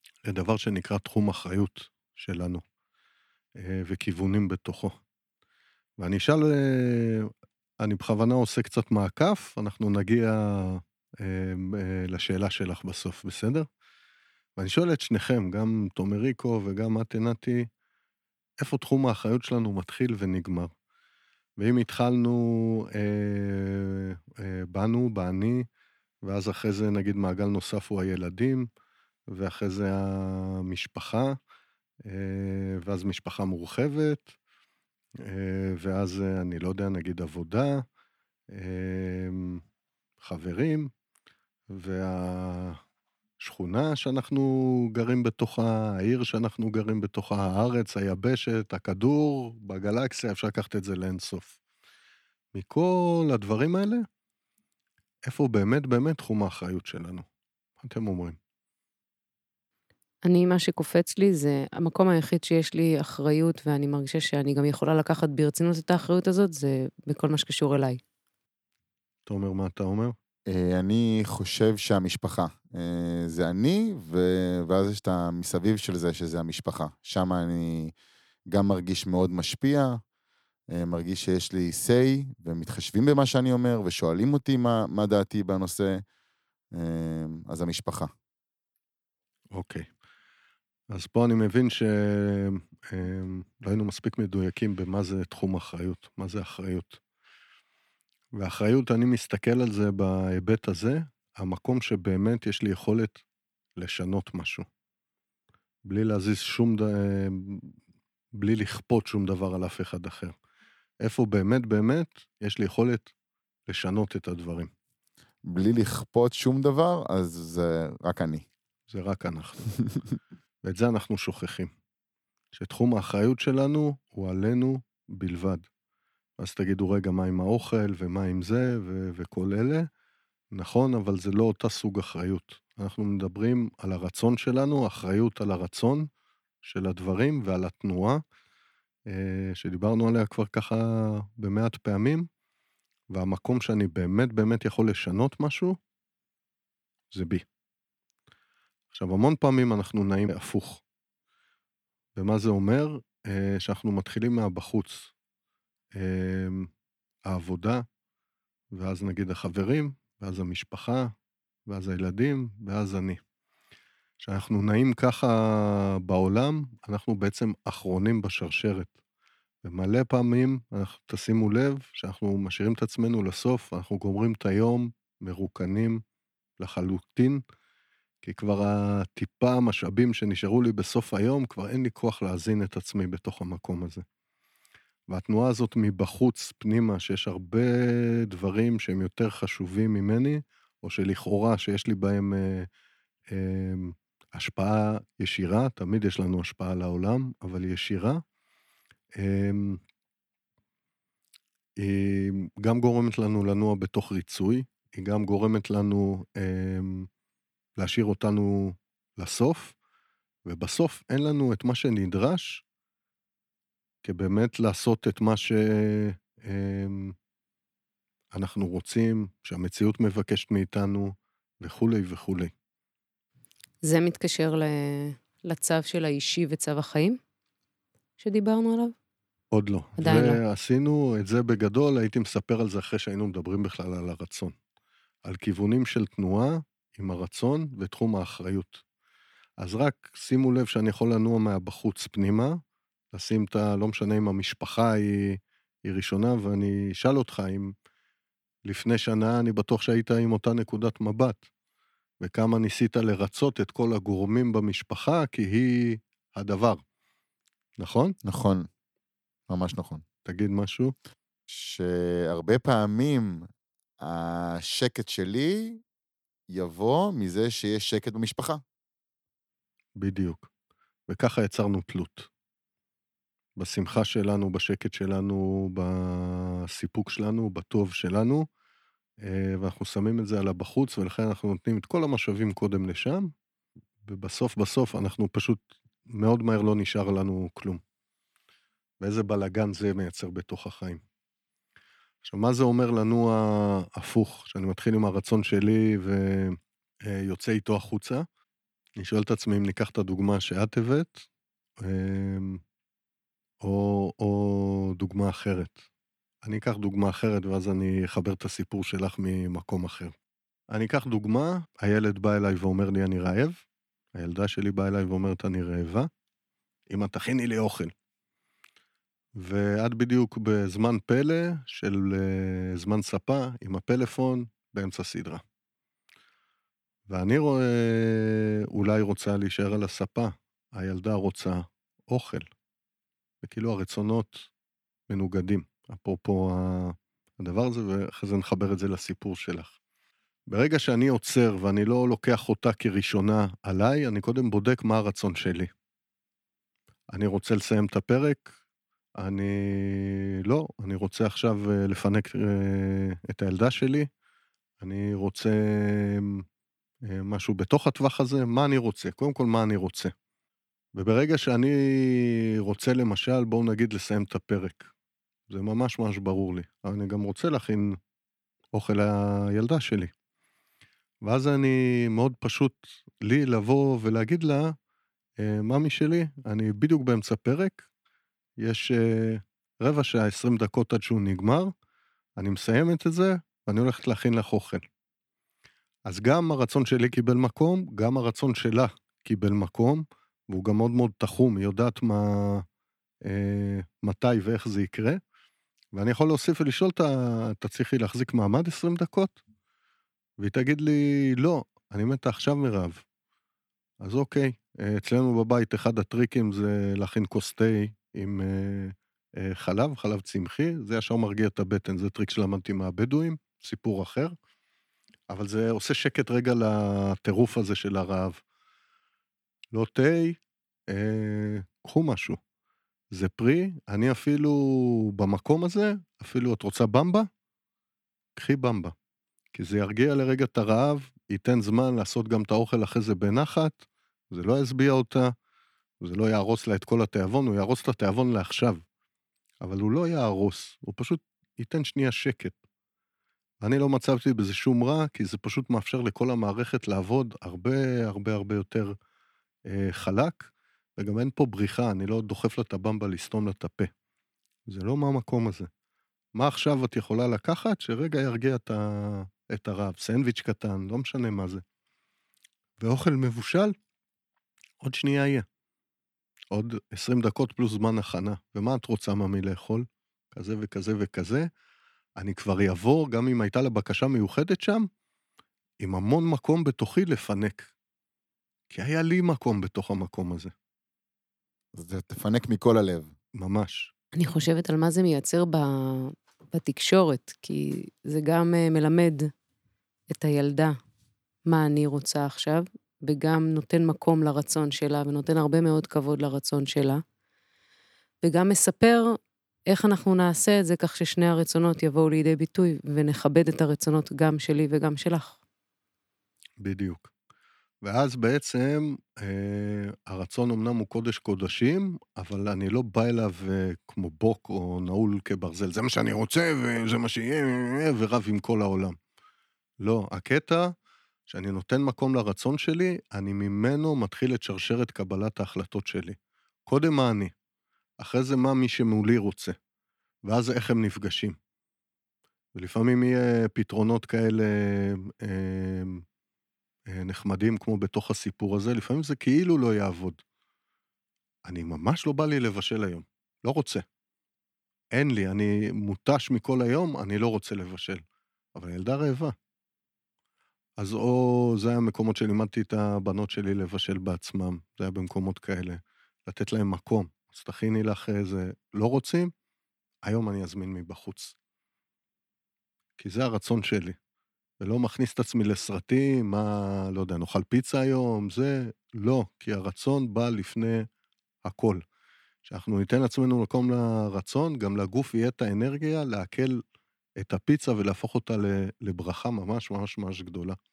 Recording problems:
none

